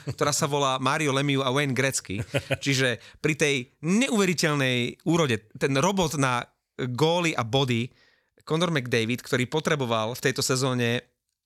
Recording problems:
none

